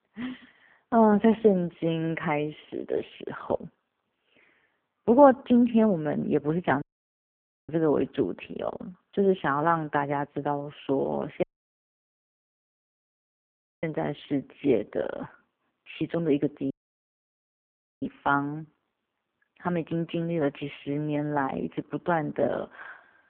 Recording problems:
phone-call audio; poor line
audio cutting out; at 7 s for 1 s, at 11 s for 2.5 s and at 17 s for 1.5 s

